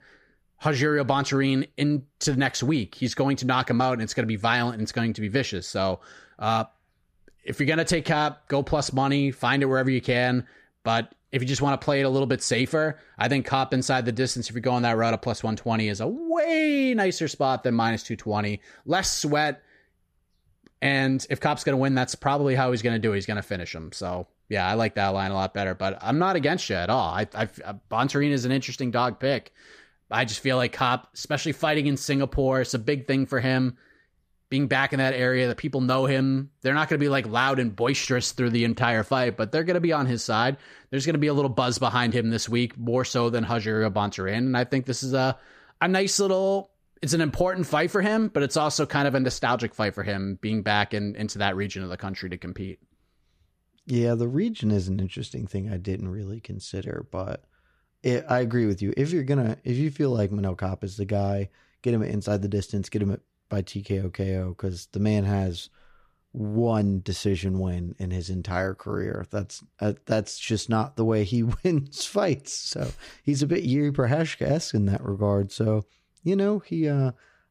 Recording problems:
none

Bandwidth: 14.5 kHz